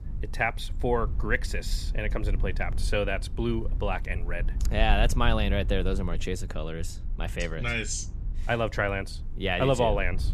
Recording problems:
low rumble; faint; throughout; 20 dB below the speech

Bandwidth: 14.5 kHz